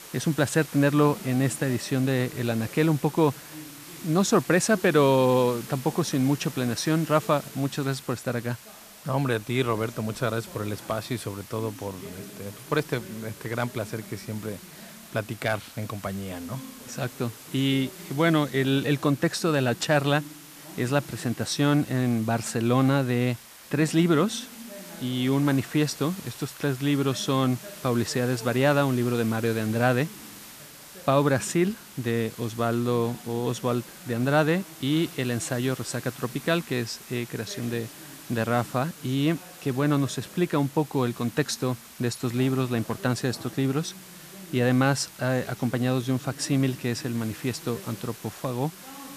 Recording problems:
hiss; noticeable; throughout; 15 dB below the speech
voice in the background; faint; throughout; 20 dB below the speech

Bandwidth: 14.5 kHz